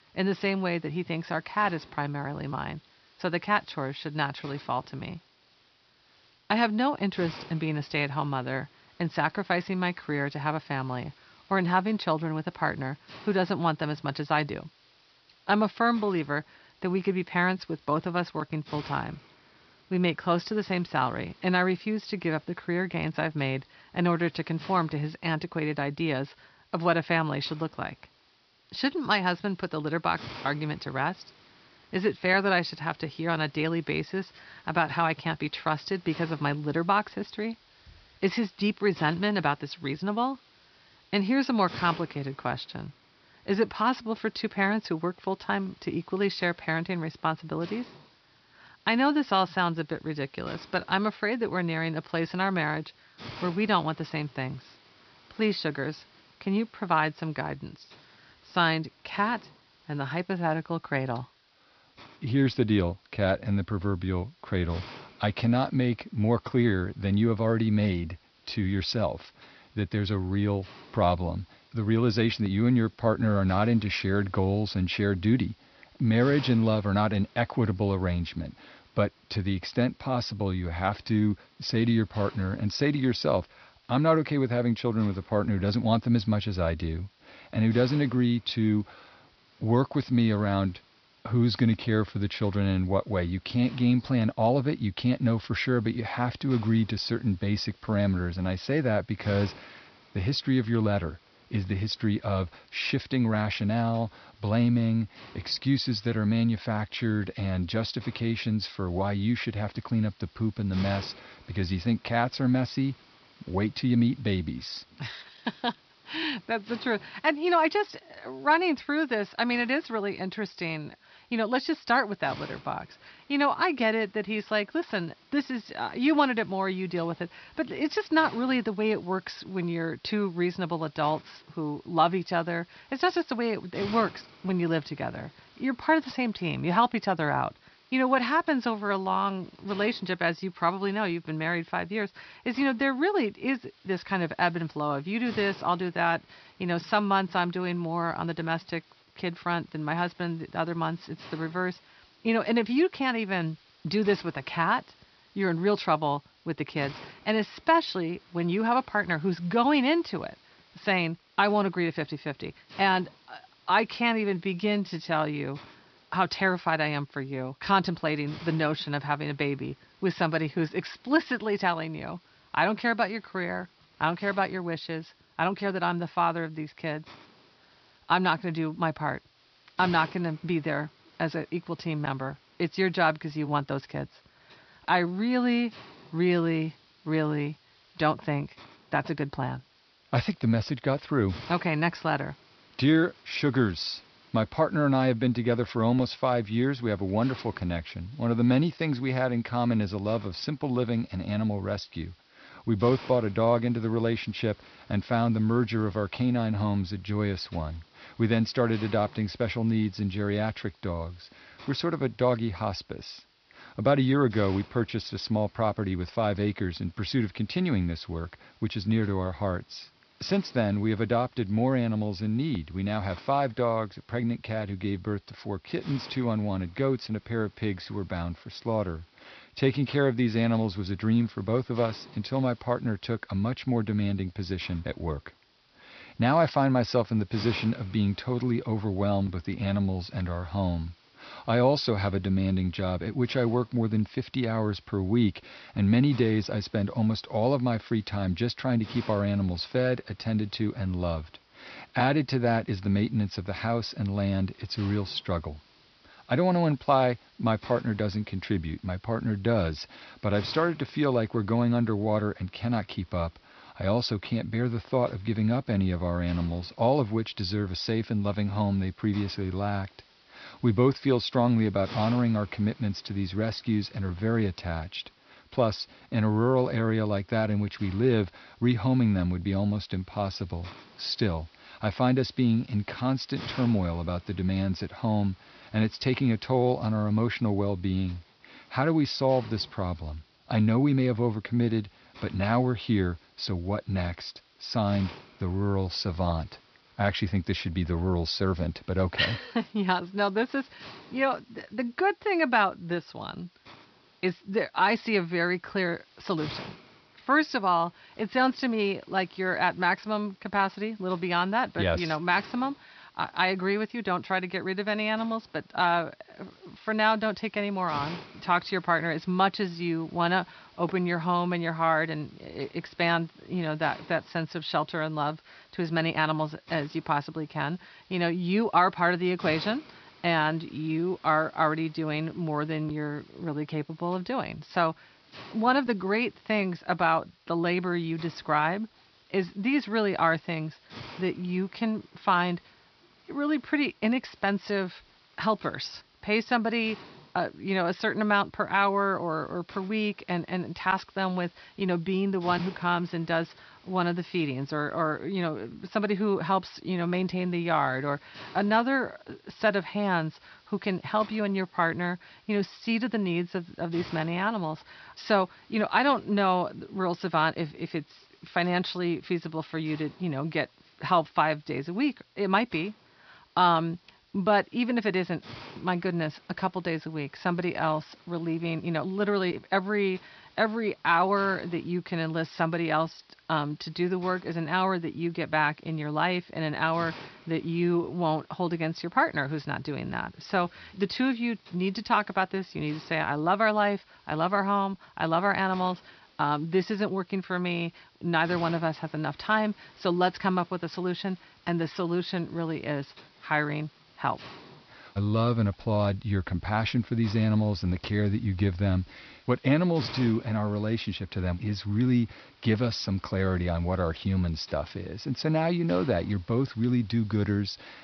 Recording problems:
high frequencies cut off; noticeable; nothing above 5.5 kHz
hiss; faint; throughout; 25 dB below the speech

